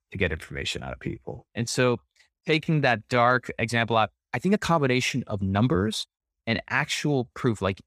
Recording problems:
uneven, jittery; strongly; from 1 to 7 s

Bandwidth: 15 kHz